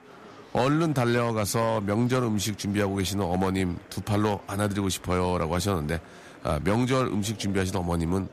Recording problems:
murmuring crowd; faint; throughout; 20 dB below the speech

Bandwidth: 14.5 kHz